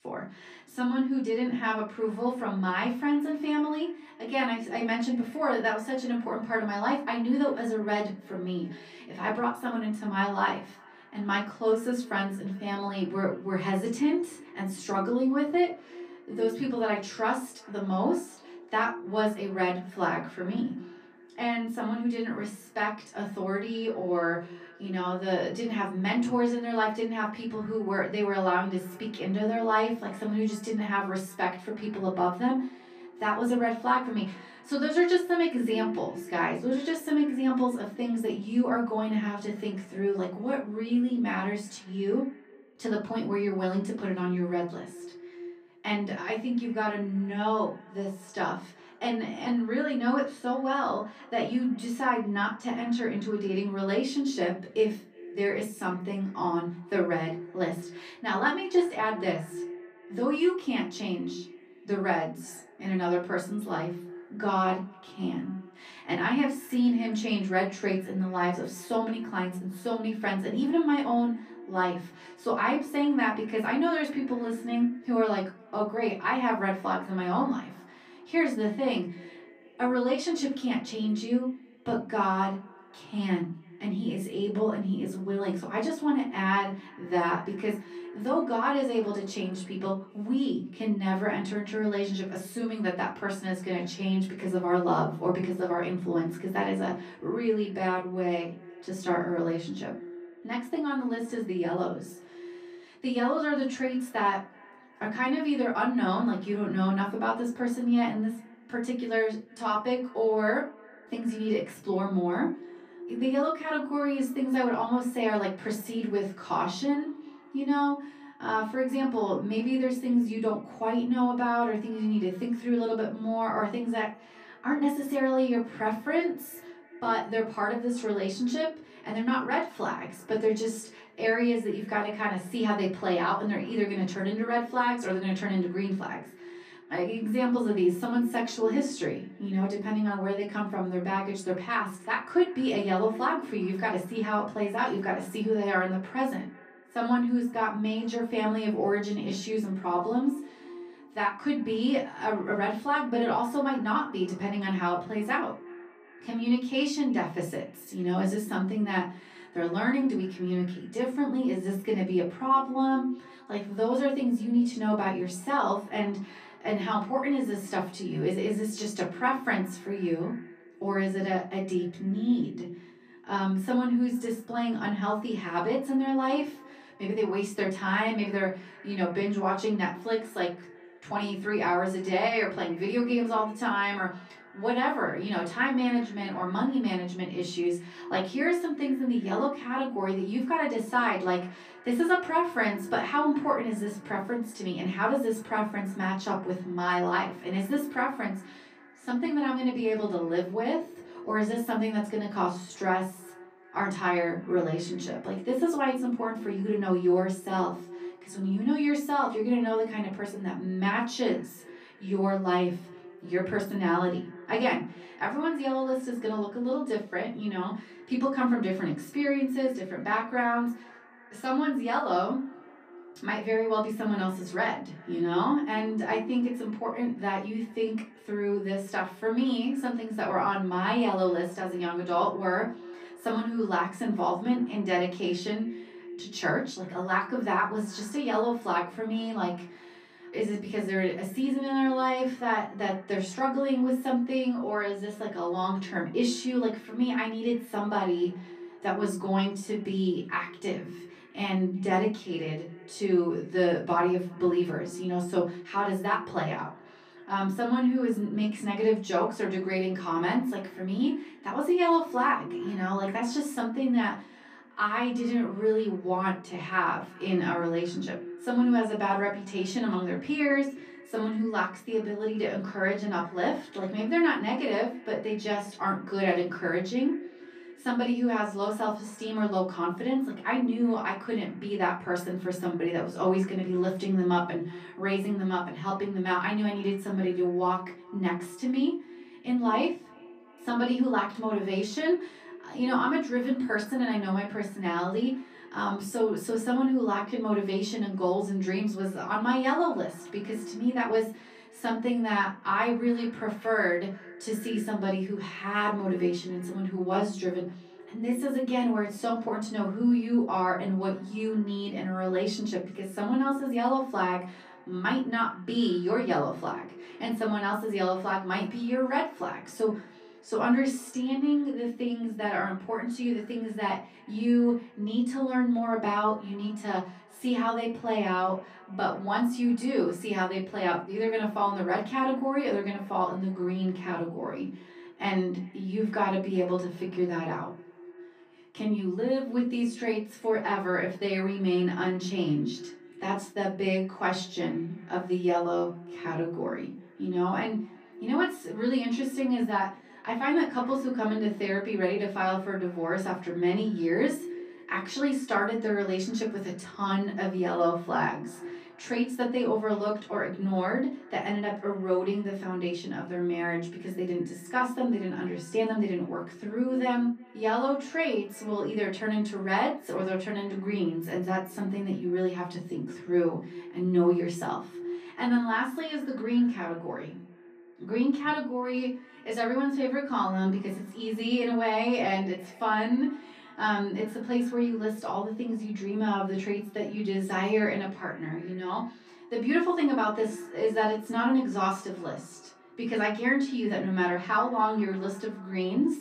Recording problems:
off-mic speech; far
echo of what is said; faint; throughout; 360 ms later, 20 dB below the speech
room echo; slight; dies away in 0.3 s

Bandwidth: 14.5 kHz